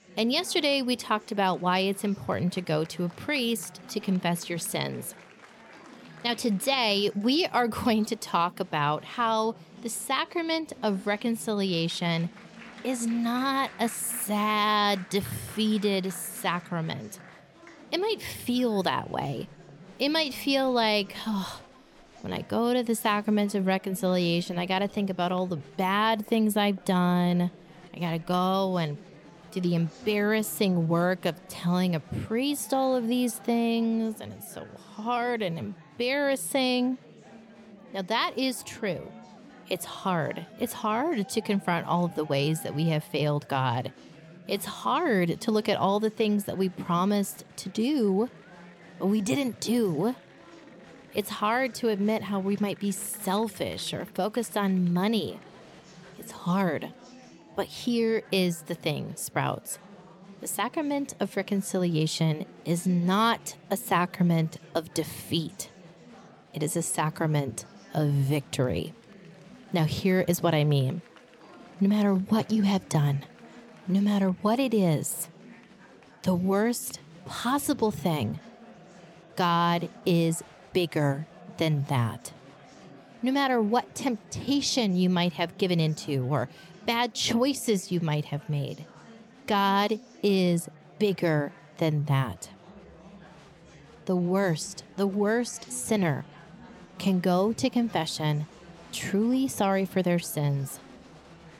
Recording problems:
murmuring crowd; faint; throughout; 20 dB below the speech

